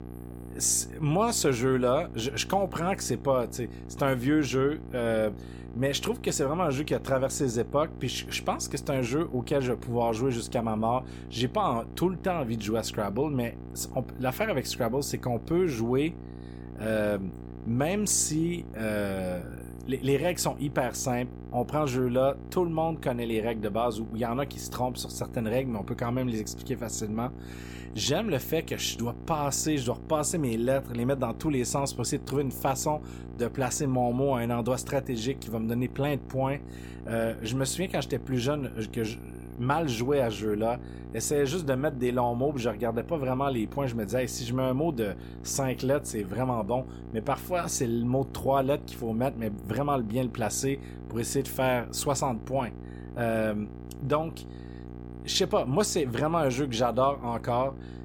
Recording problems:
electrical hum; noticeable; throughout; 60 Hz, 20 dB below the speech

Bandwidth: 17 kHz